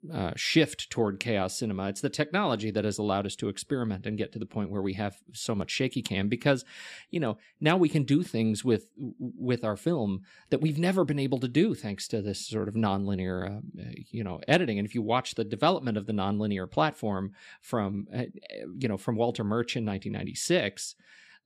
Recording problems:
none

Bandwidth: 14.5 kHz